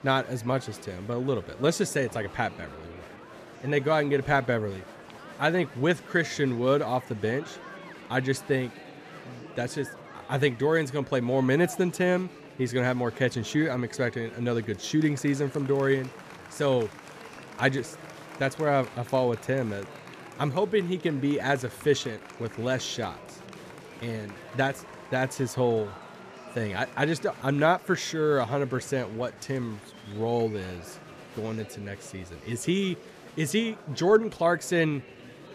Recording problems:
murmuring crowd; noticeable; throughout; 15 dB below the speech

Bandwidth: 14.5 kHz